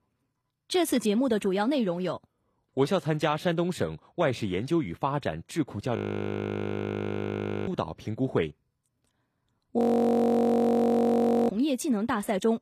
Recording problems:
audio freezing; at 6 s for 1.5 s and at 10 s for 1.5 s

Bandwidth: 14.5 kHz